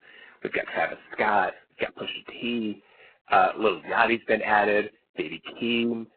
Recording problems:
phone-call audio; poor line; nothing above 4 kHz
garbled, watery; badly

